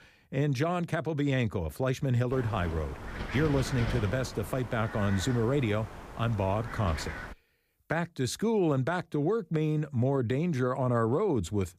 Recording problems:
wind noise on the microphone; heavy; from 2.5 to 7.5 s; 8 dB below the speech

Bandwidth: 15 kHz